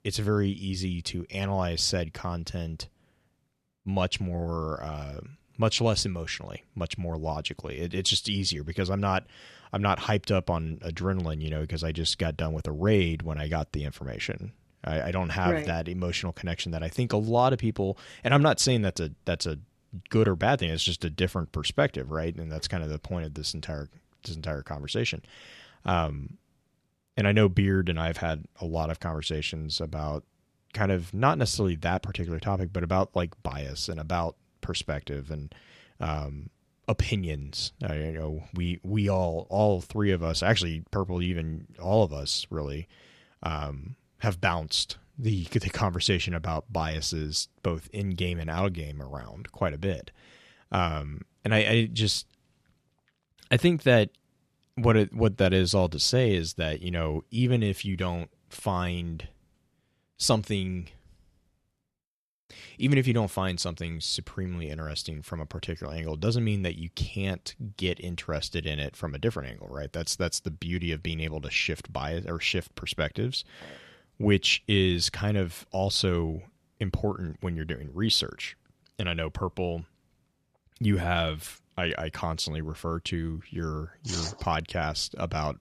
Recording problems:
none

